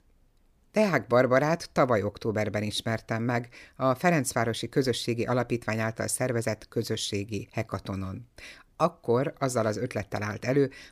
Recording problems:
none

